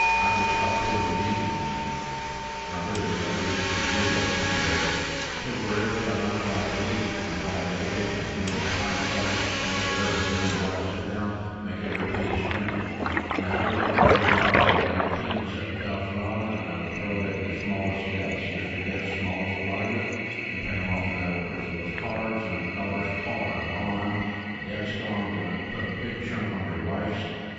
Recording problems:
room echo; strong; dies away in 2.1 s
off-mic speech; far
garbled, watery; badly; nothing above 7.5 kHz
echo of what is said; faint; from 7.5 s on; 440 ms later, 20 dB below the speech
household noises; very loud; throughout; 3 dB above the speech
alarms or sirens; loud; until 18 s; 2 dB below the speech

